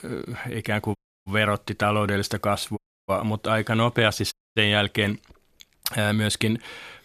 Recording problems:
audio cutting out; at 1 s, at 3 s and at 4.5 s

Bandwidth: 14 kHz